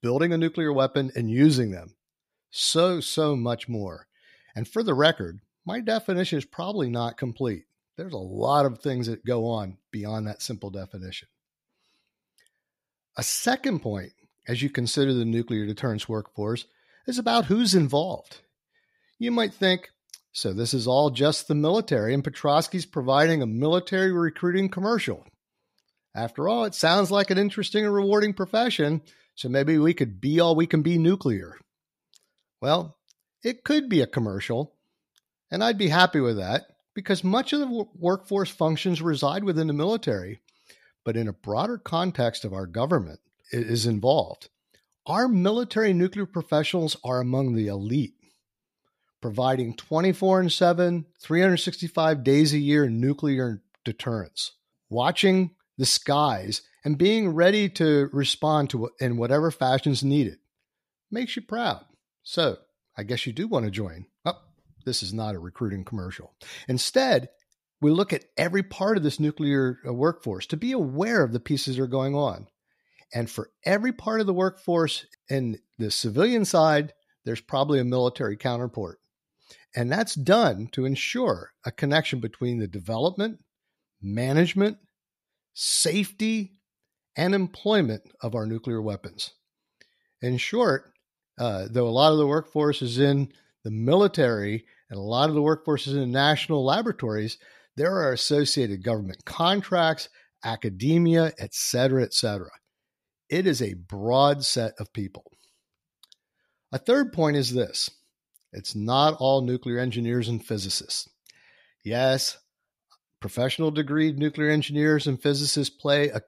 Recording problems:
none

